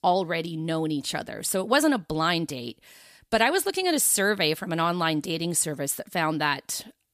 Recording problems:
none

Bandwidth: 14.5 kHz